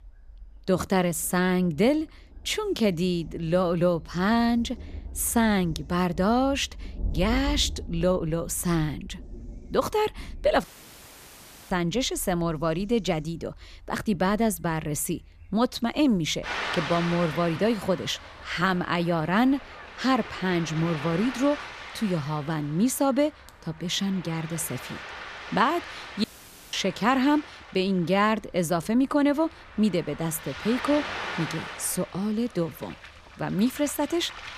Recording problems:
rain or running water; noticeable; throughout; 15 dB below the speech
audio cutting out; at 11 s for 1 s and at 26 s

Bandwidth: 14.5 kHz